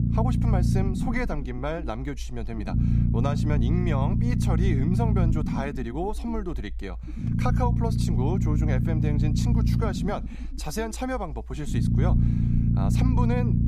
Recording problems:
low rumble; loud; throughout; 2 dB below the speech

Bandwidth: 14.5 kHz